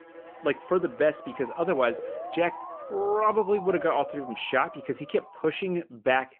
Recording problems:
phone-call audio; nothing above 3 kHz
background music; faint; until 4.5 s; 20 dB below the speech
siren; noticeable; until 5.5 s; peak 9 dB below the speech

